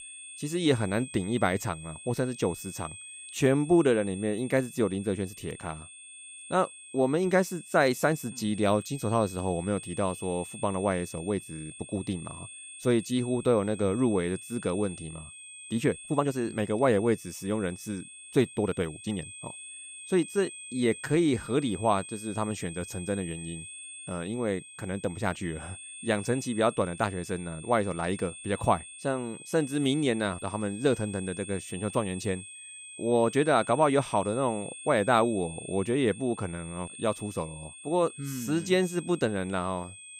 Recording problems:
high-pitched whine; noticeable; throughout; 8.5 kHz, 15 dB below the speech
uneven, jittery; strongly; from 16 to 21 s

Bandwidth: 15.5 kHz